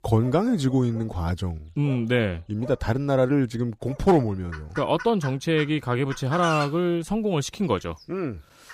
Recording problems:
animal sounds; noticeable; throughout; 15 dB below the speech

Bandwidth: 15 kHz